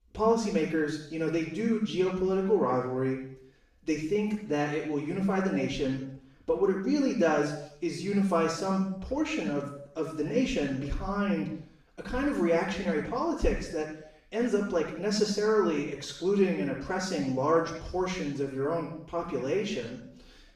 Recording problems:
off-mic speech; far
room echo; noticeable; dies away in 0.7 s

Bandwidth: 14.5 kHz